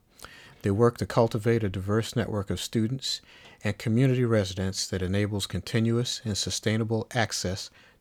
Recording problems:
none

